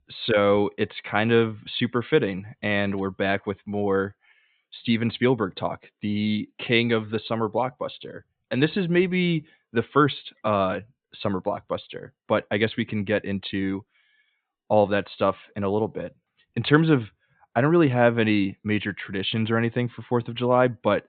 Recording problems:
high frequencies cut off; severe; nothing above 4 kHz

